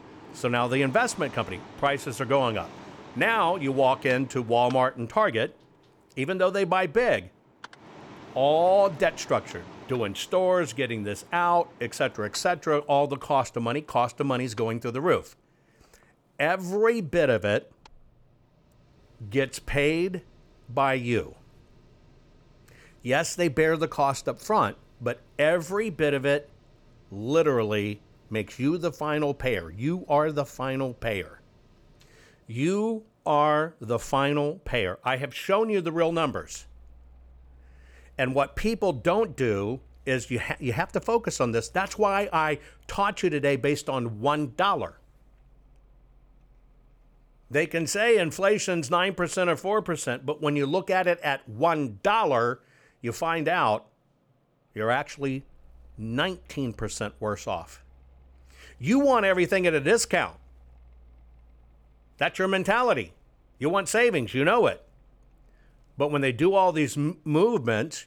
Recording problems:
machinery noise; faint; throughout; 25 dB below the speech

